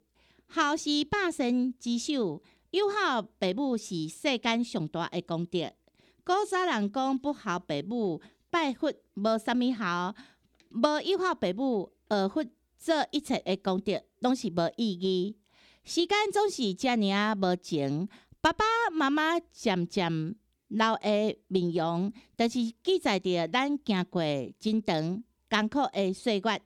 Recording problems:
none

